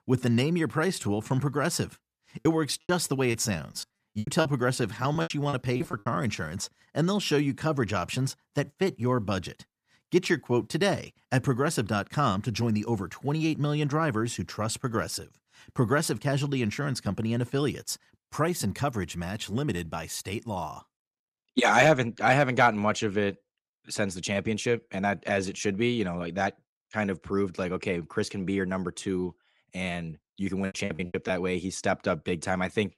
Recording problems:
choppy; very; from 2.5 to 6 s and at 31 s; 18% of the speech affected

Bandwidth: 14.5 kHz